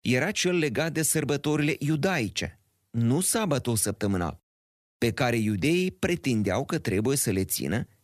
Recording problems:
none

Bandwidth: 14 kHz